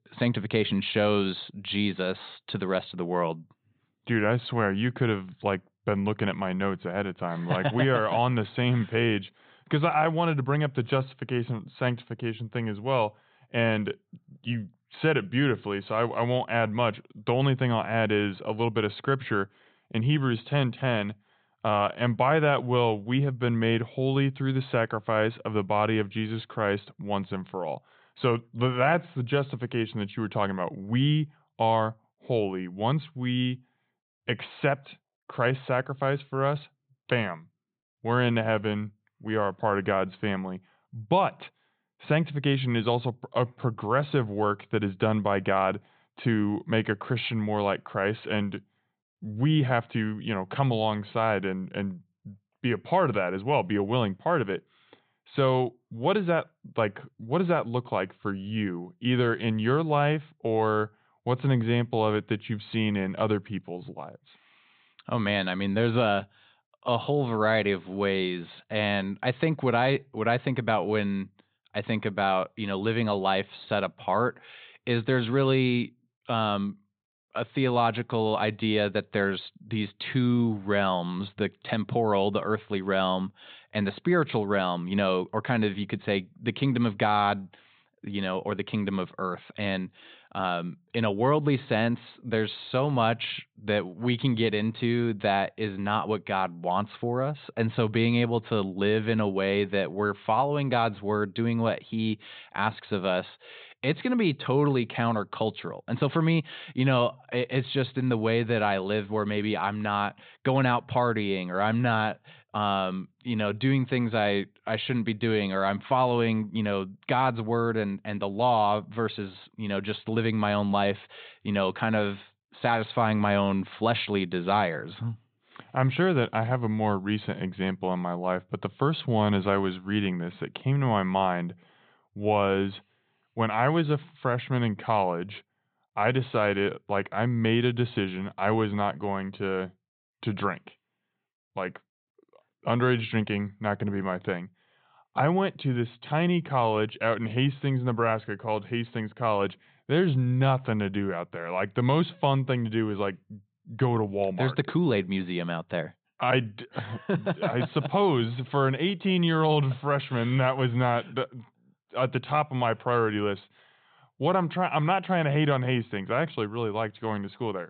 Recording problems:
high frequencies cut off; severe; nothing above 4 kHz

